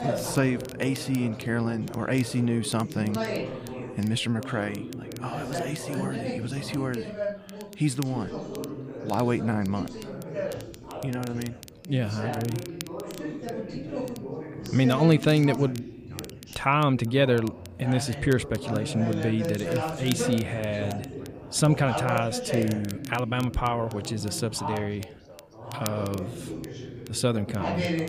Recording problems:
background chatter; loud; throughout; 3 voices, 8 dB below the speech
crackle, like an old record; noticeable; 20 dB below the speech

